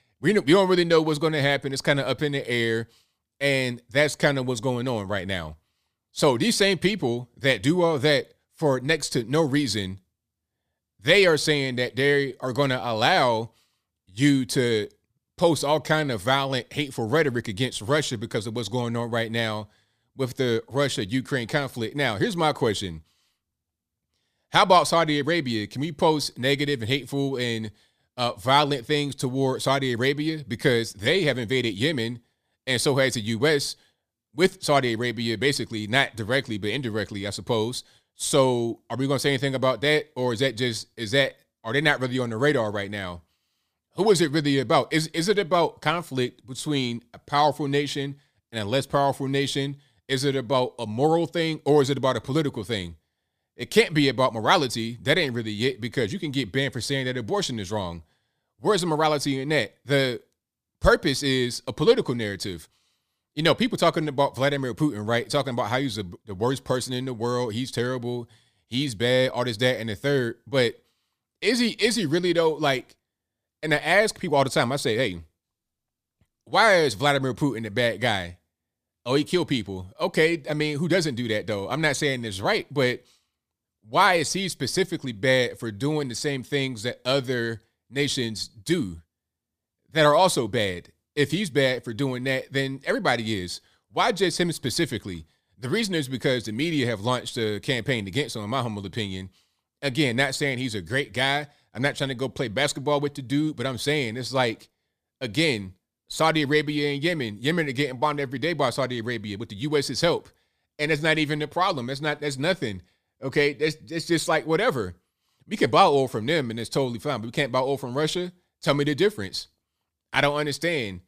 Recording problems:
none

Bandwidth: 15 kHz